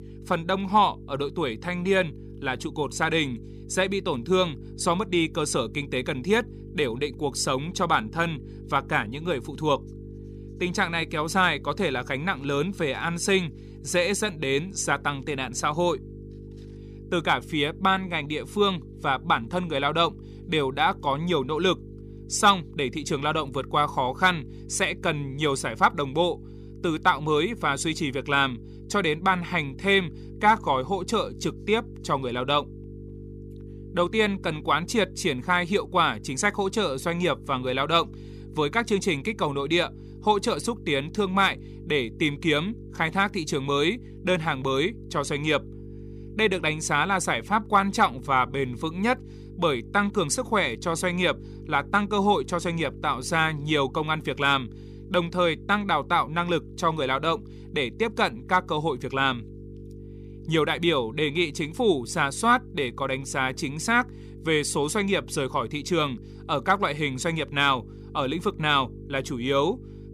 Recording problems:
electrical hum; faint; throughout; 50 Hz, 25 dB below the speech

